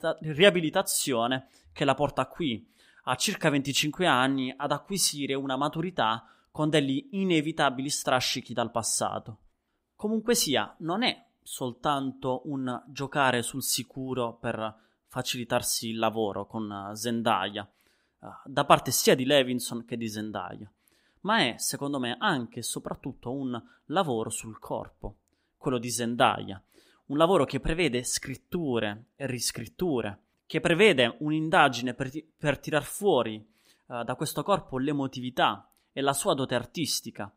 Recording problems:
none

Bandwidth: 15.5 kHz